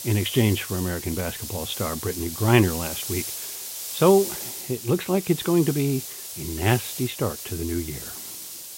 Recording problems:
high frequencies cut off; severe; nothing above 4 kHz
hiss; loud; throughout; 7 dB below the speech

